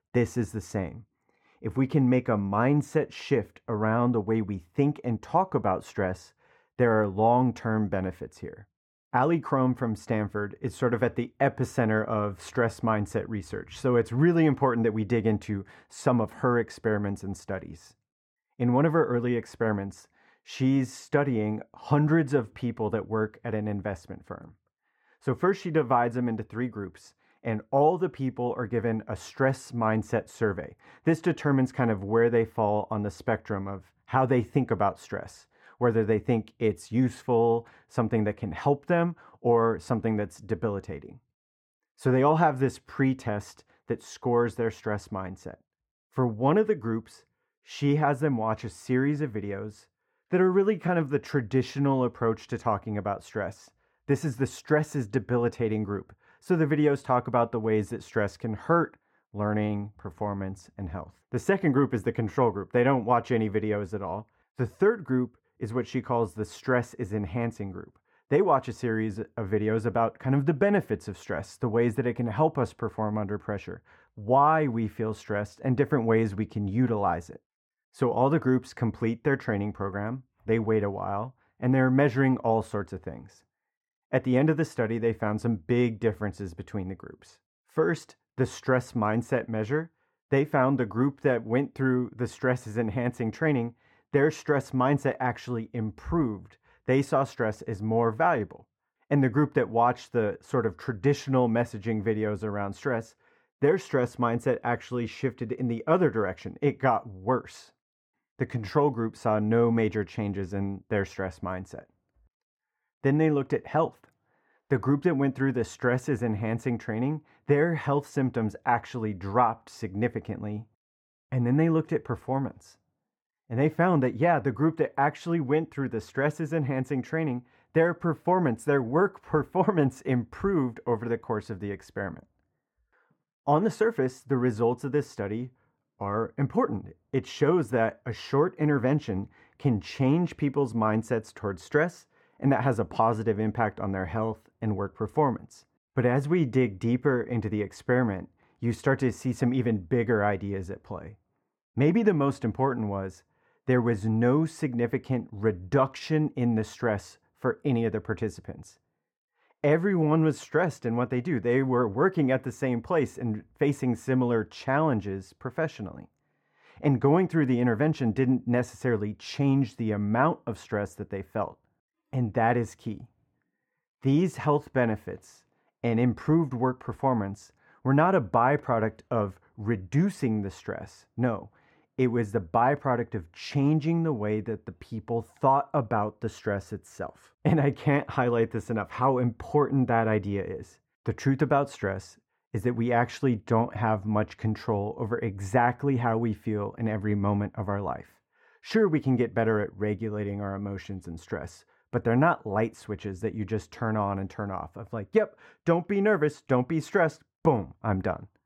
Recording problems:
muffled; very; fading above 3 kHz

